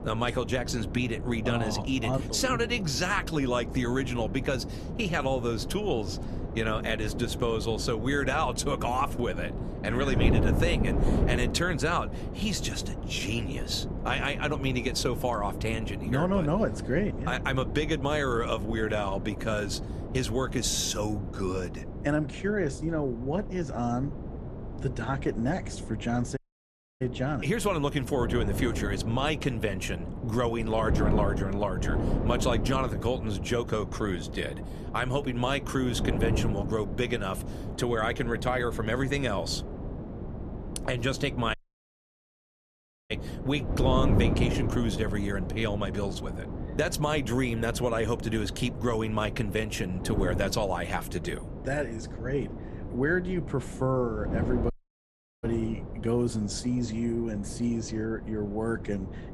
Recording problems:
wind noise on the microphone; heavy; 10 dB below the speech
audio cutting out; at 26 s for 0.5 s, at 42 s for 1.5 s and at 55 s for 0.5 s

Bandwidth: 13.5 kHz